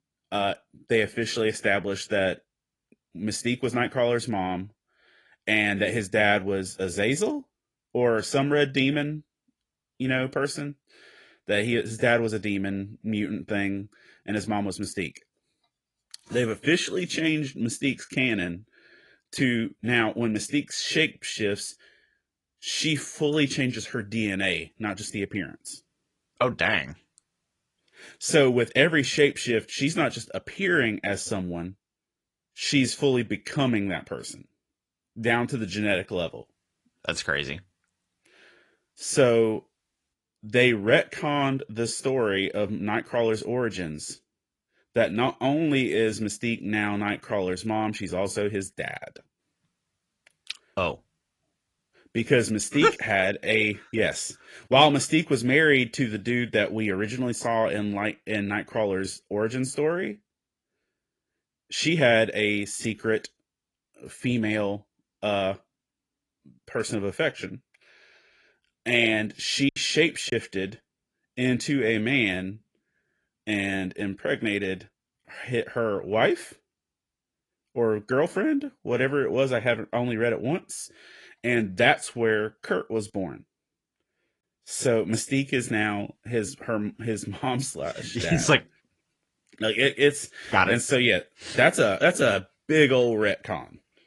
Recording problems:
garbled, watery; slightly; nothing above 10.5 kHz
choppy; occasionally; at 1:10; 2% of the speech affected

